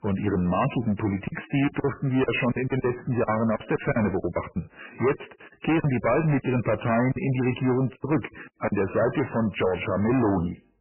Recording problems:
distortion; heavy; 7 dB below the speech
garbled, watery; badly; nothing above 3 kHz
choppy; very; from 1.5 to 4.5 s and from 5 to 8.5 s; 15% of the speech affected

